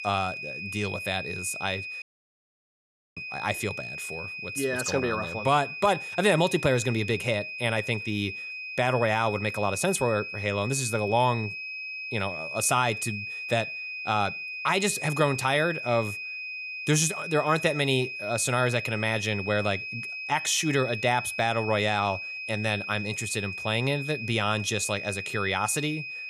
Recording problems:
high-pitched whine; loud; throughout; 2.5 kHz, 7 dB below the speech
audio cutting out; at 2 s for 1 s

